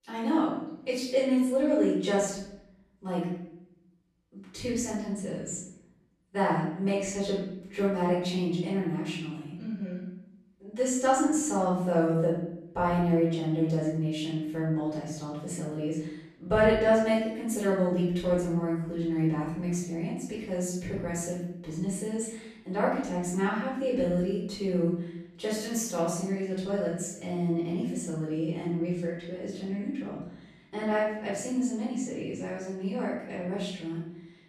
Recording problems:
off-mic speech; far
room echo; noticeable; dies away in 0.7 s

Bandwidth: 14 kHz